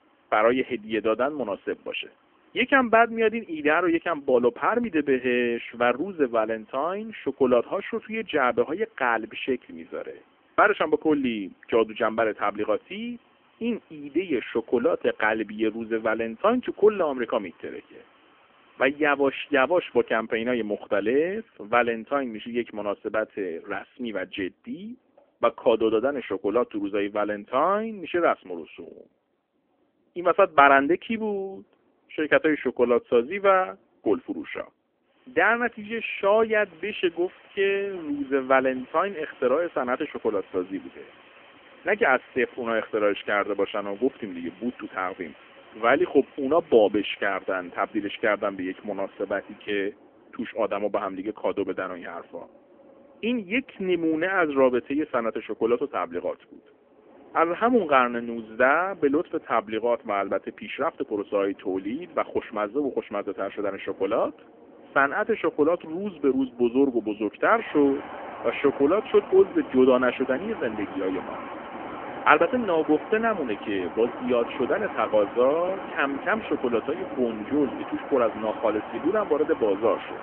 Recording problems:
phone-call audio; poor line; nothing above 3 kHz
wind in the background; noticeable; throughout; 15 dB below the speech

